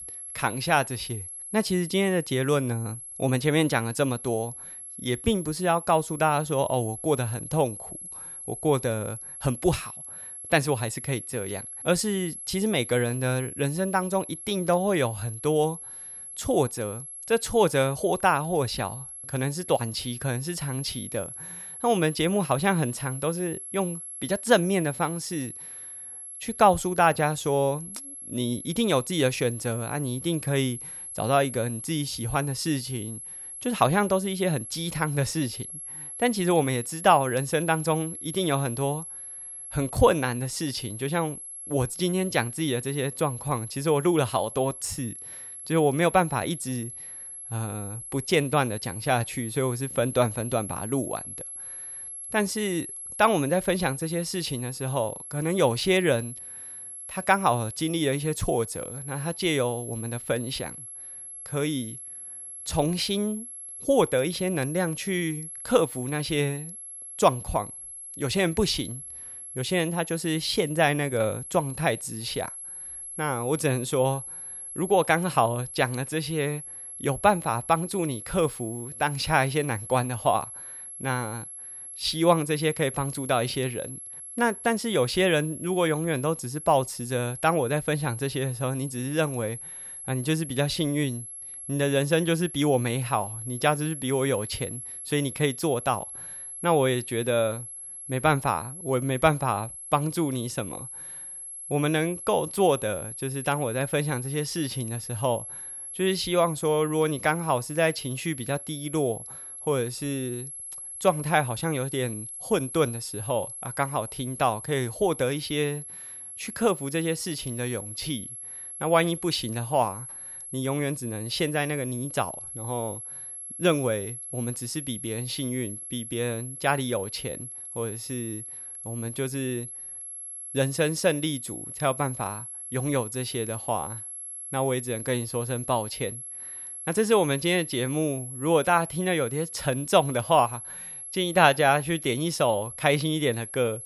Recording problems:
high-pitched whine; loud; throughout; 11 kHz, 10 dB below the speech

